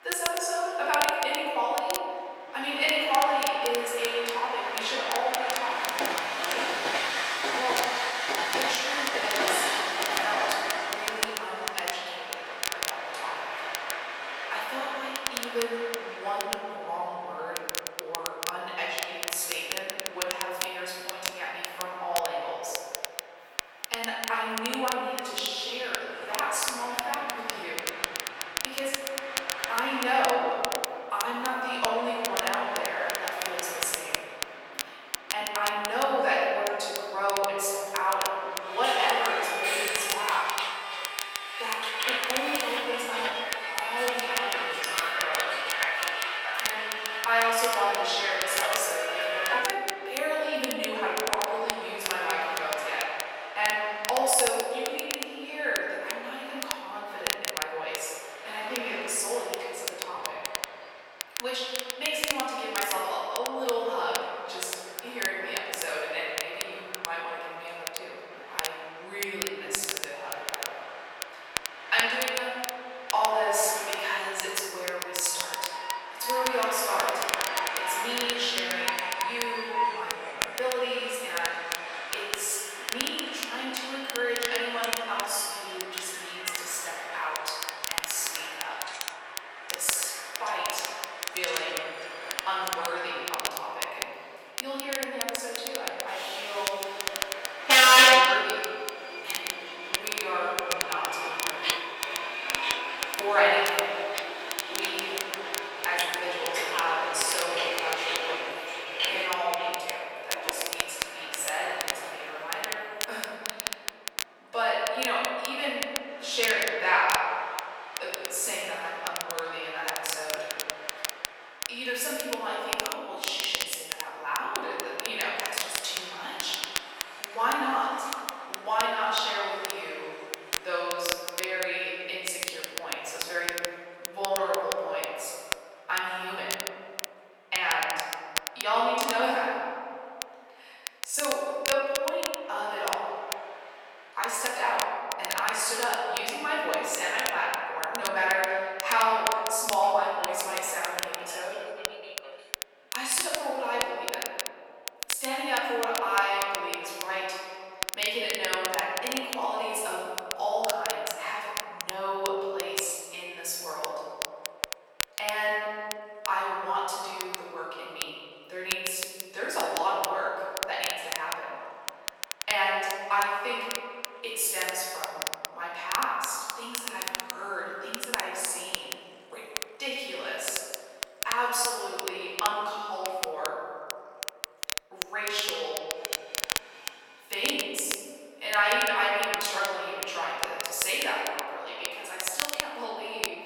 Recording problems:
room echo; strong; dies away in 2.2 s
off-mic speech; far
thin; very; fading below 650 Hz
train or aircraft noise; loud; throughout; 1 dB below the speech
crackle, like an old record; loud; 5 dB below the speech

